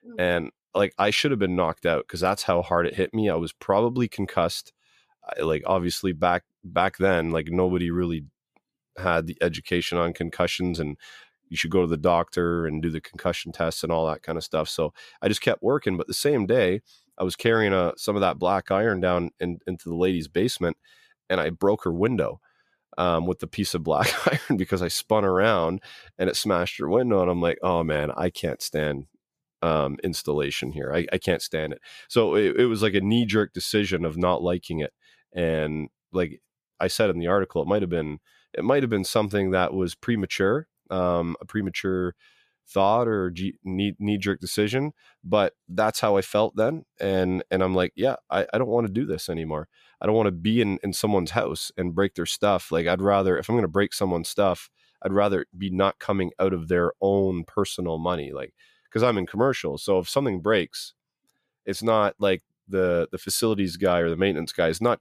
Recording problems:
none

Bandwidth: 14.5 kHz